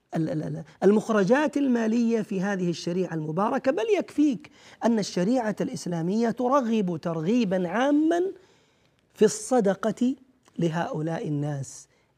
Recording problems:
none

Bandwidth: 15 kHz